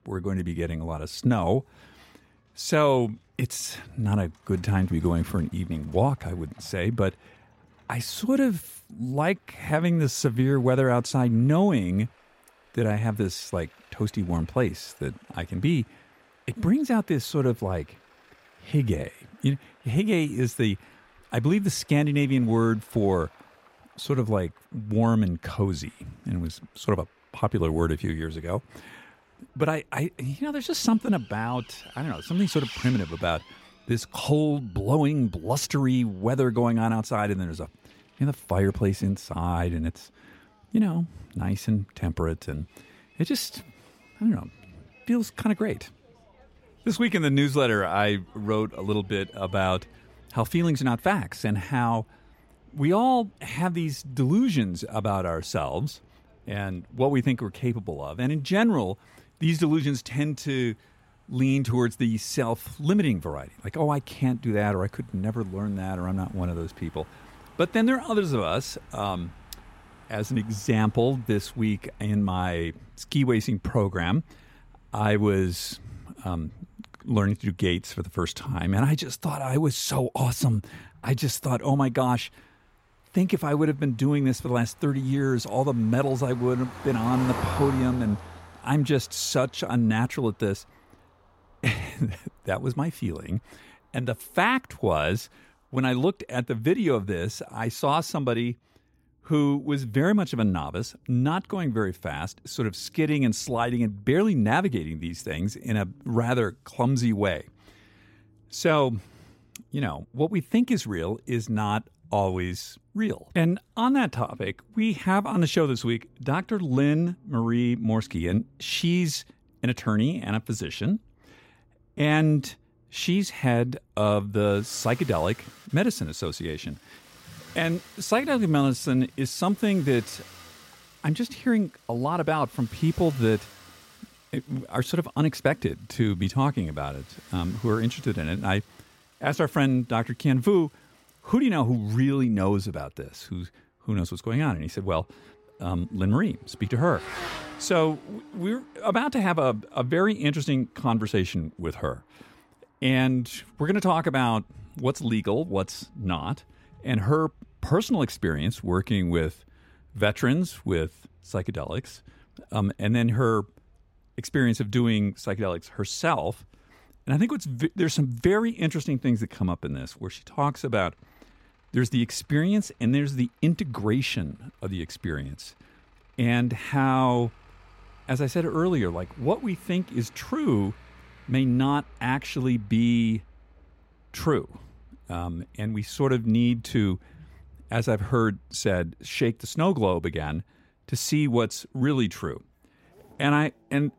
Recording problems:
traffic noise; faint; throughout; 20 dB below the speech

